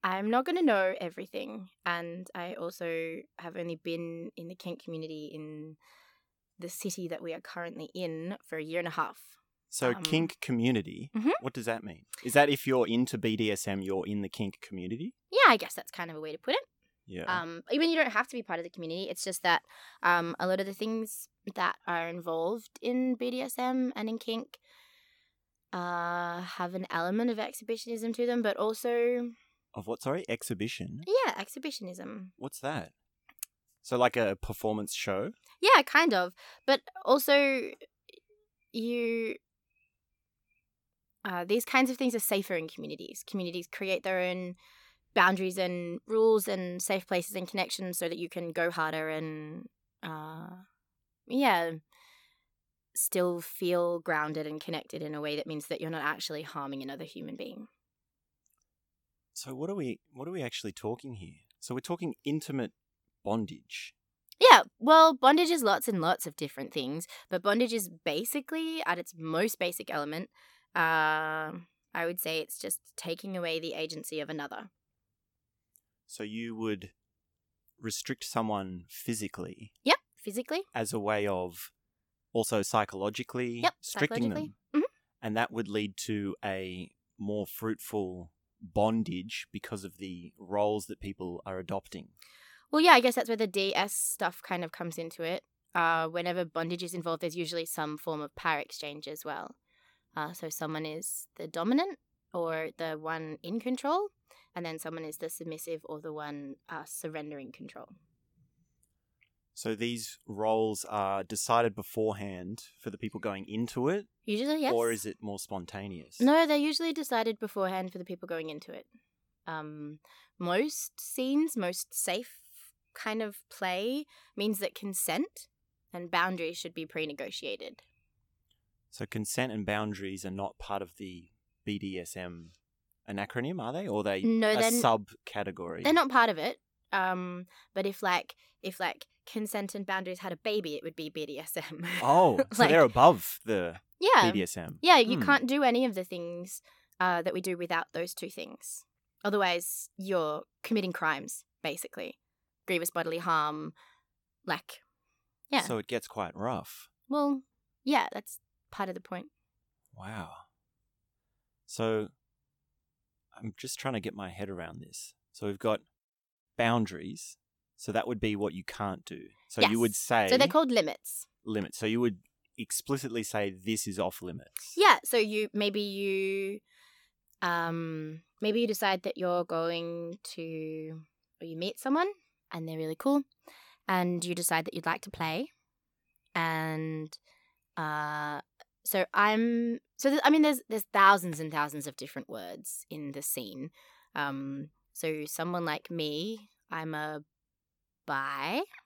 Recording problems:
uneven, jittery; strongly; from 2.5 s to 2:28

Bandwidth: 17.5 kHz